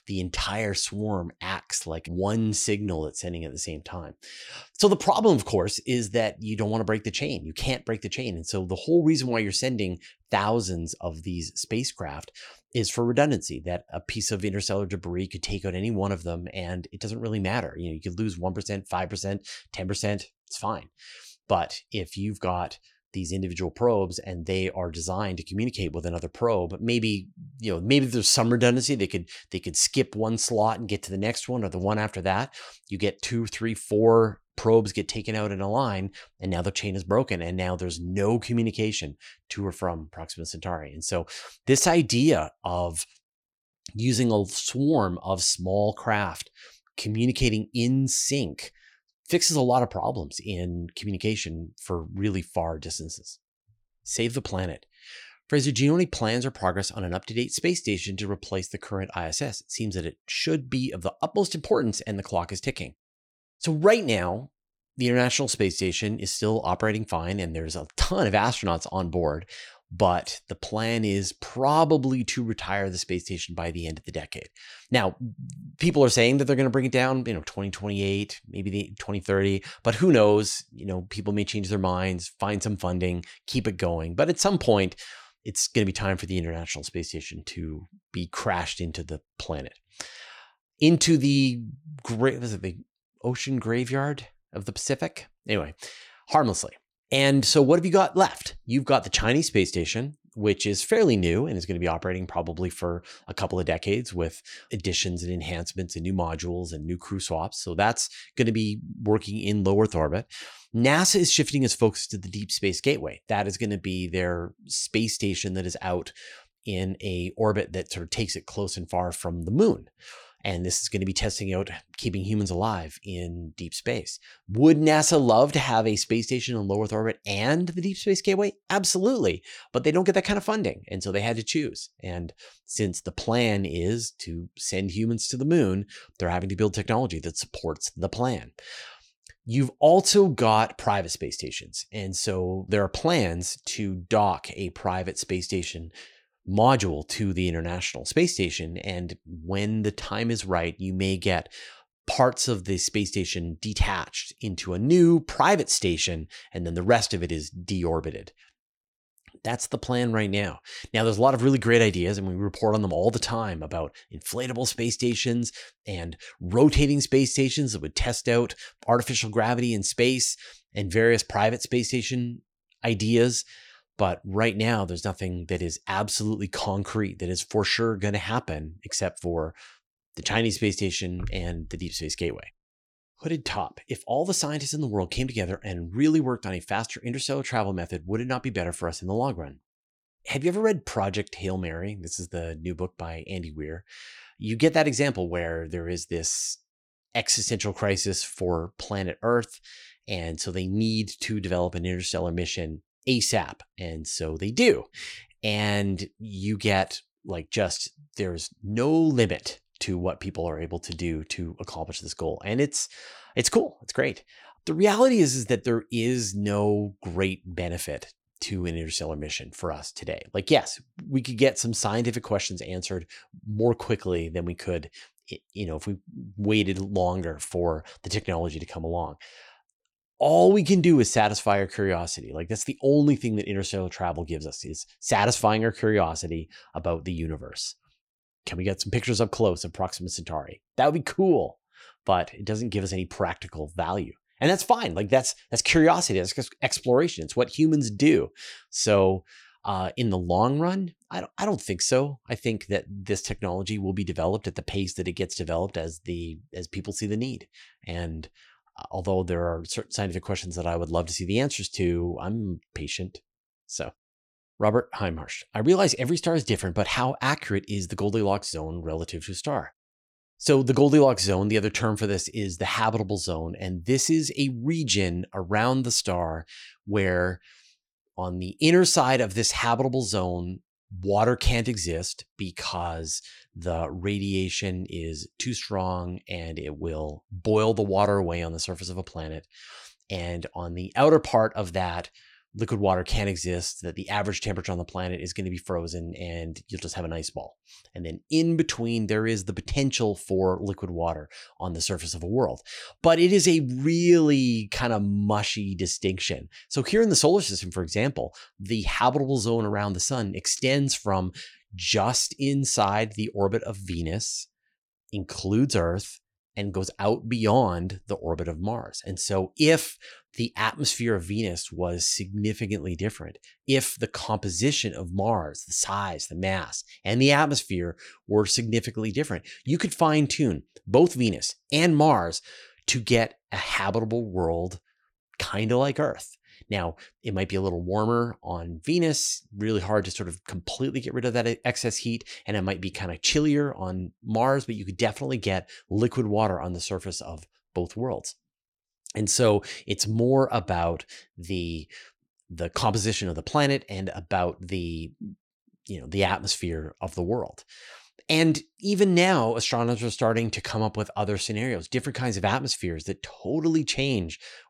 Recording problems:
none

